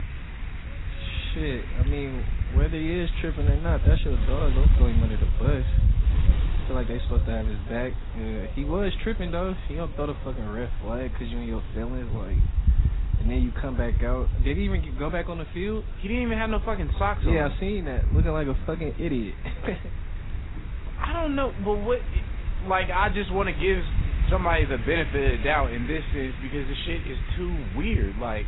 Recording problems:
garbled, watery; badly; nothing above 4 kHz
wind noise on the microphone; occasional gusts; 10 dB below the speech
animal sounds; faint; throughout; 25 dB below the speech

